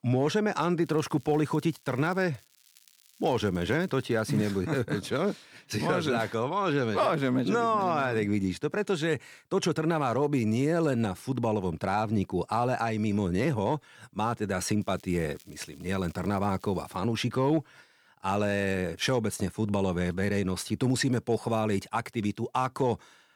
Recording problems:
crackling; faint; from 1 to 2.5 s, from 2.5 to 4.5 s and from 15 to 17 s; 30 dB below the speech

